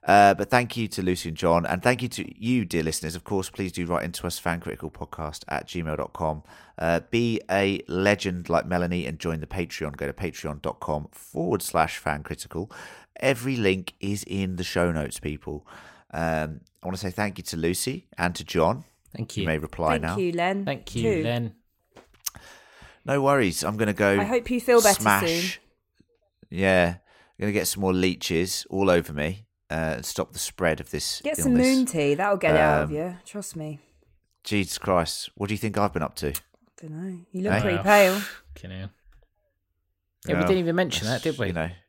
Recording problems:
none

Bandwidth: 16 kHz